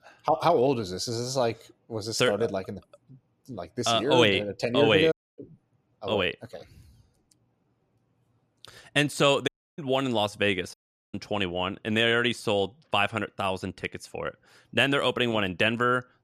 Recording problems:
audio cutting out; at 5 s, at 9.5 s and at 11 s

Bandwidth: 14 kHz